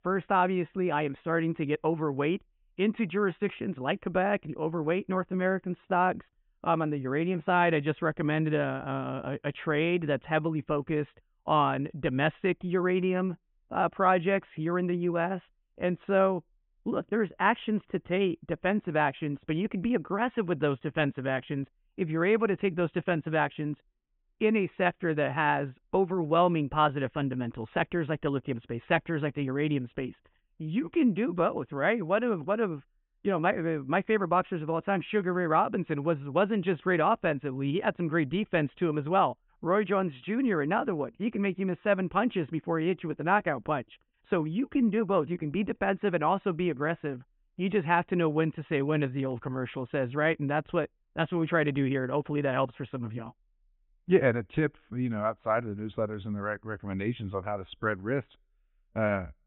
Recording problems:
high frequencies cut off; severe; nothing above 3.5 kHz

